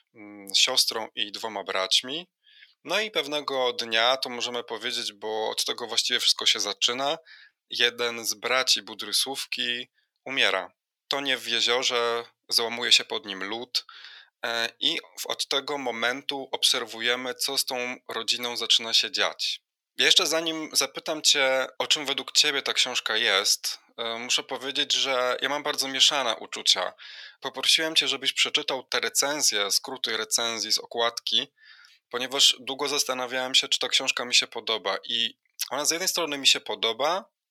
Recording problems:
thin; very; fading below 650 Hz

